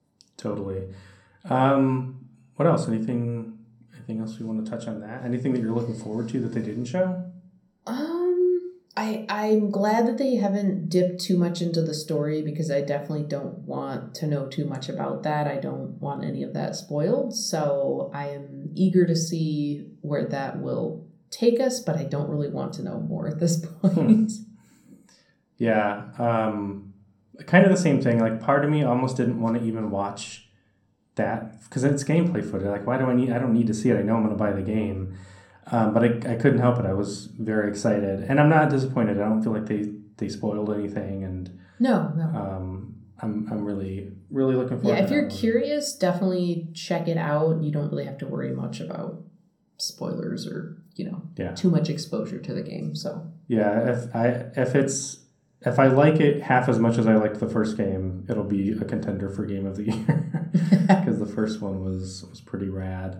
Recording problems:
room echo; slight; dies away in 0.6 s
off-mic speech; somewhat distant

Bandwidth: 17.5 kHz